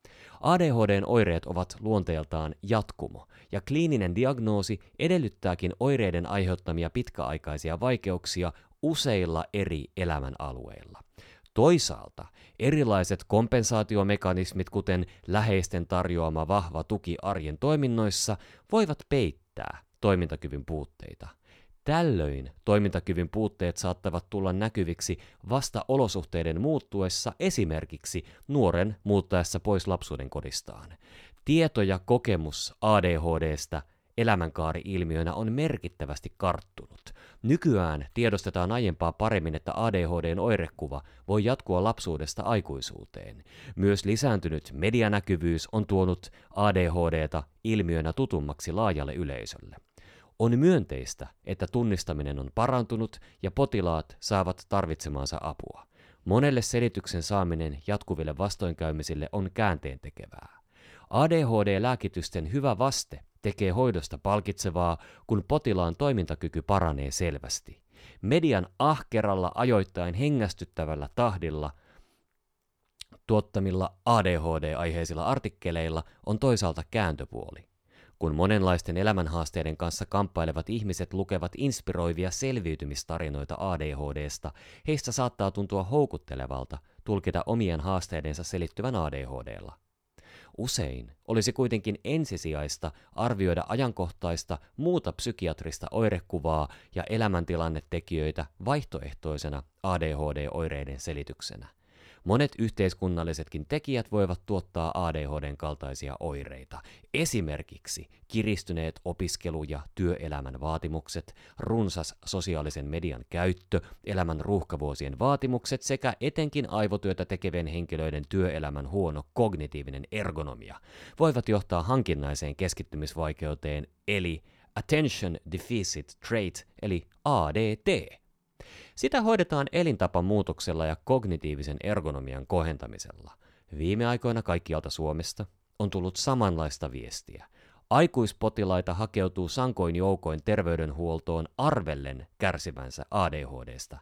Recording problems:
none

